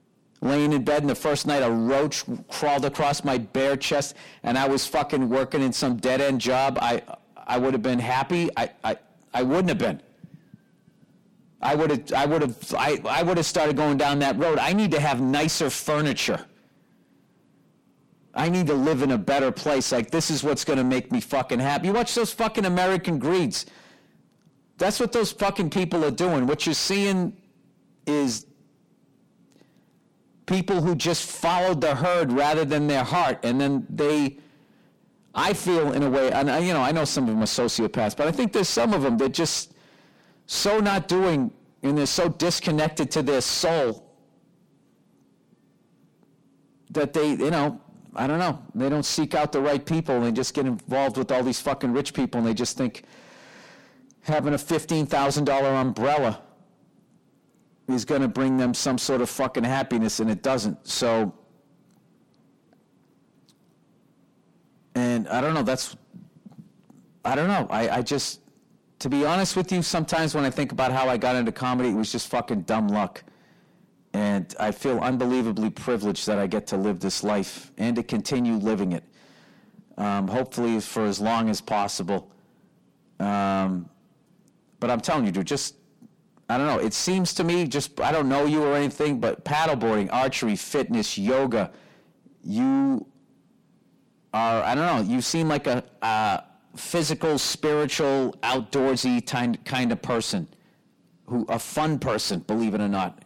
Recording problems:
distortion; heavy; 6 dB below the speech

